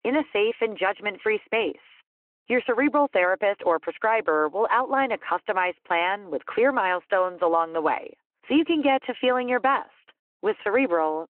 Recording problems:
phone-call audio

